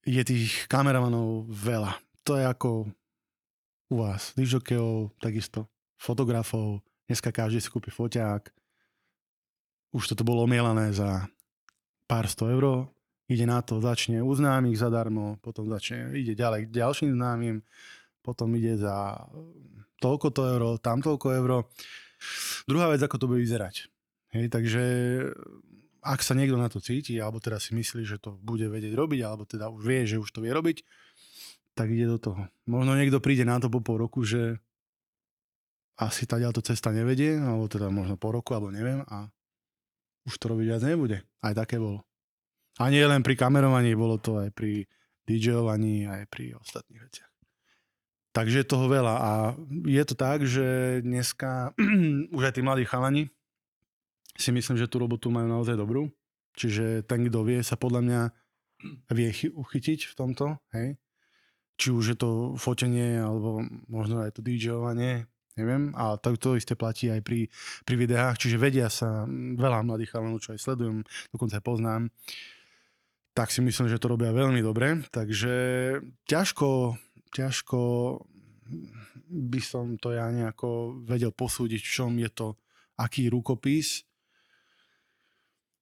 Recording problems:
none

